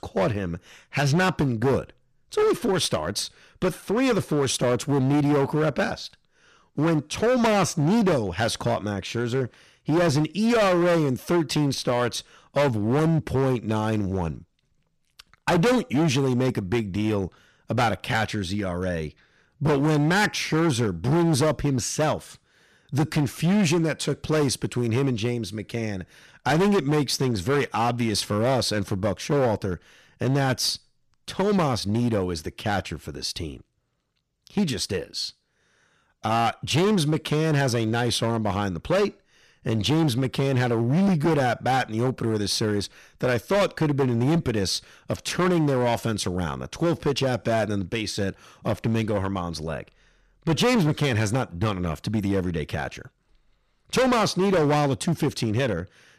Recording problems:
distortion; heavy; 13% of the sound clipped

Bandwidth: 14.5 kHz